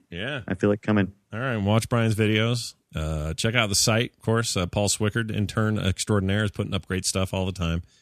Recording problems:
none

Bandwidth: 14 kHz